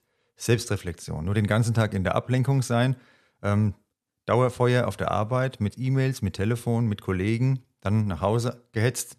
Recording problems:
none

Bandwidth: 13.5 kHz